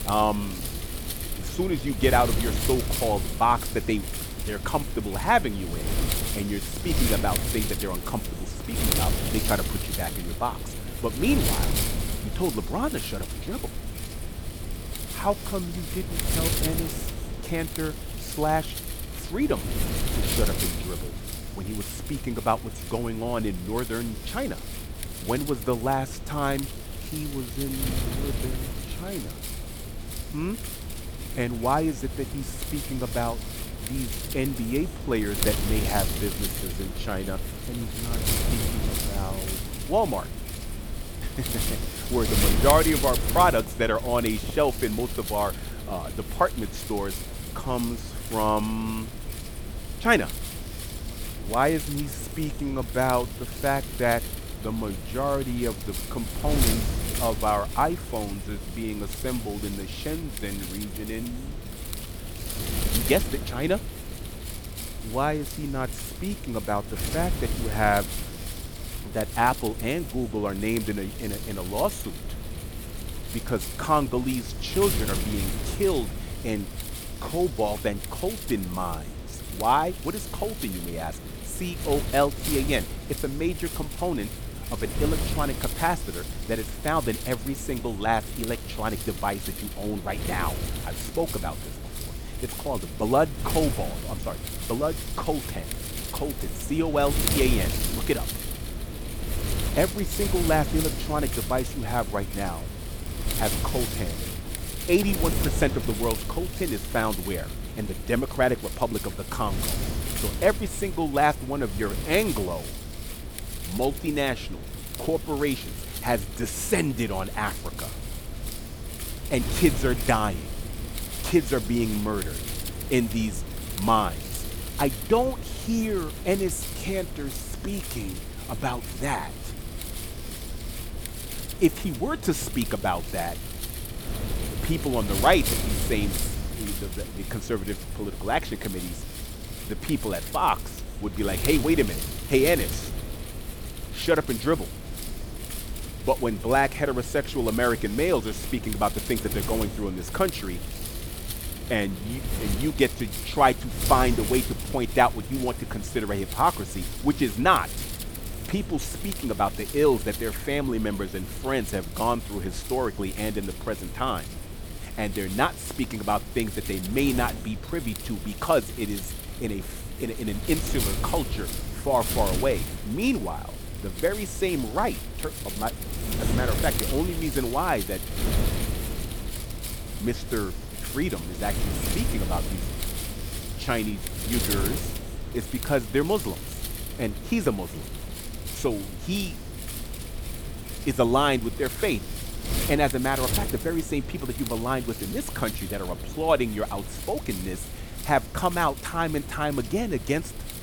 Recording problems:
wind noise on the microphone; heavy; 9 dB below the speech

